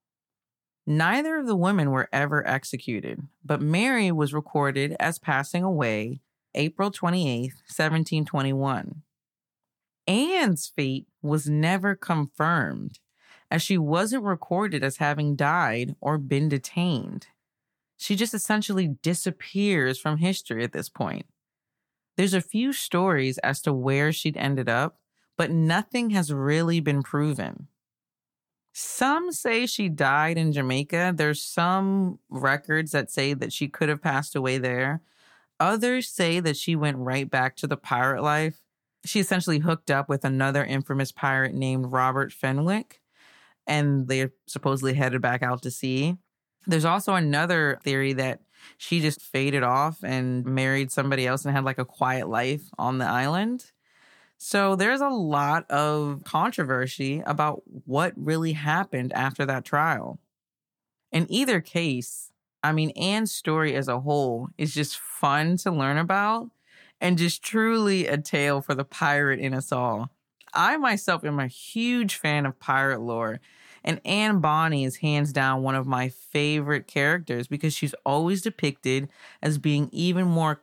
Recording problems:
none

